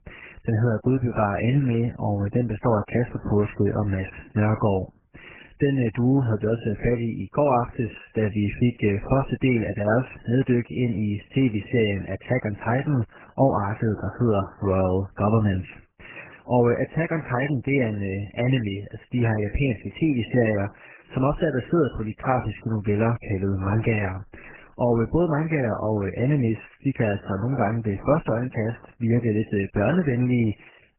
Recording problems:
garbled, watery; badly; nothing above 3 kHz

